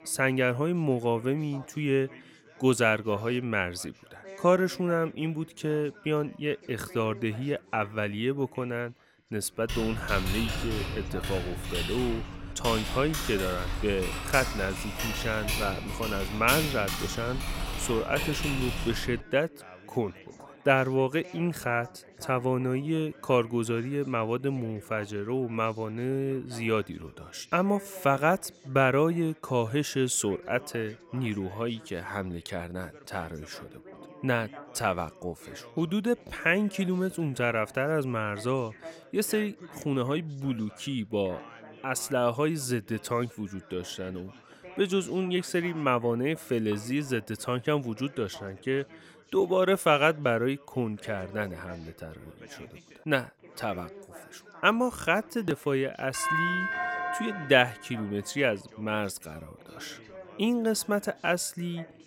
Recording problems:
background chatter; faint; throughout; 3 voices, 20 dB below the speech
keyboard typing; loud; from 9.5 to 19 s; peak 1 dB above the speech
doorbell; loud; from 56 to 58 s; peak 2 dB above the speech

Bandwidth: 16.5 kHz